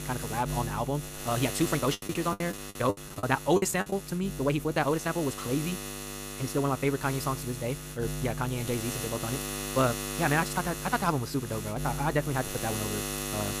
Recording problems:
wrong speed, natural pitch; too fast; 1.7 times normal speed
electrical hum; loud; throughout; 60 Hz, 7 dB below the speech
choppy; very; from 2 to 4 s; 28% of the speech affected

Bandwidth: 15 kHz